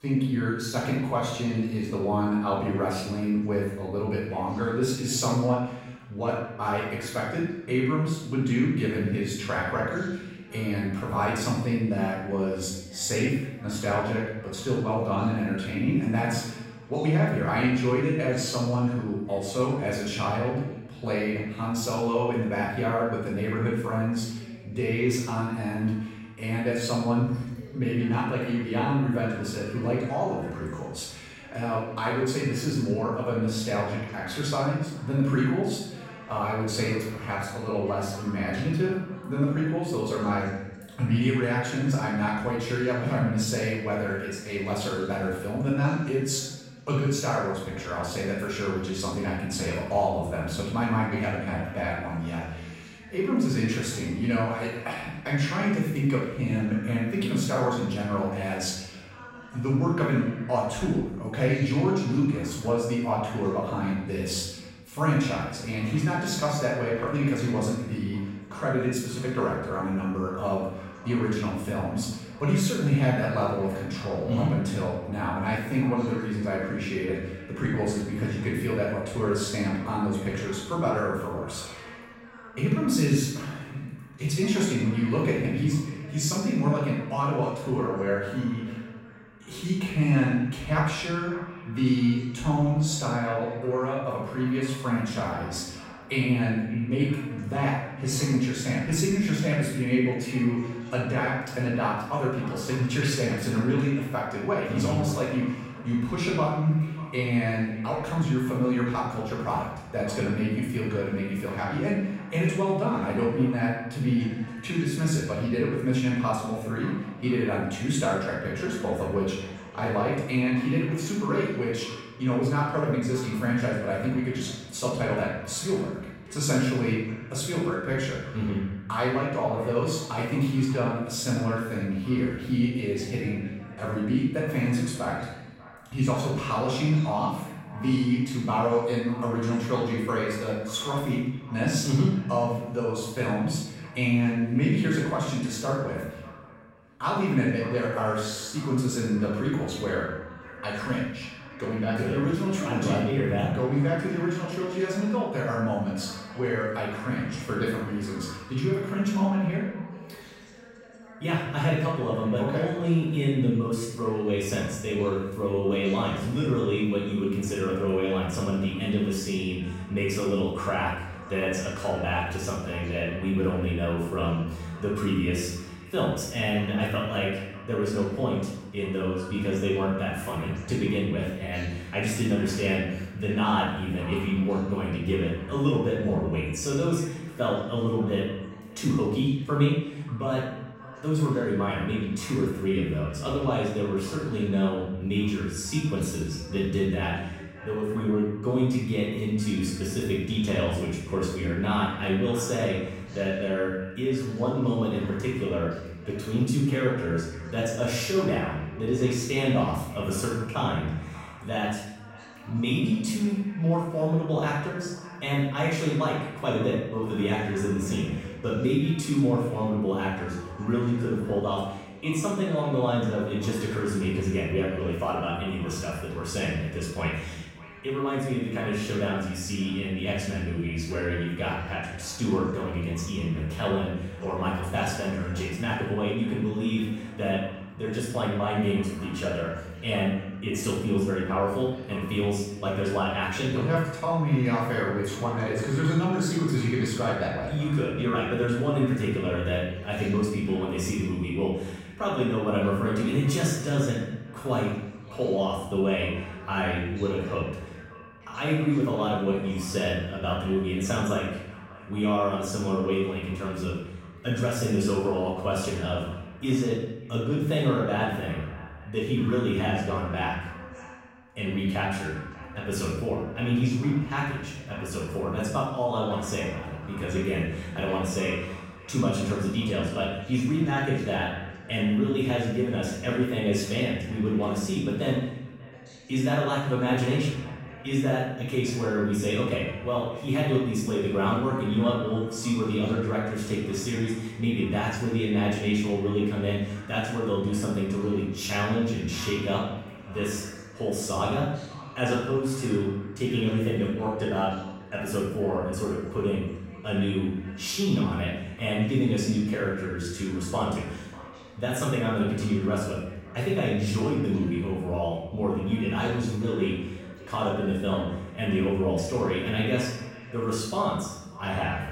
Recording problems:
off-mic speech; far
room echo; noticeable; dies away in 0.9 s
echo of what is said; faint; from 1:06 on; 590 ms later, 20 dB below the speech
voice in the background; faint; throughout; 20 dB below the speech

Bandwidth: 16 kHz